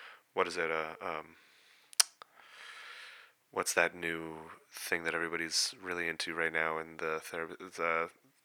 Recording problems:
thin; very; fading below 650 Hz

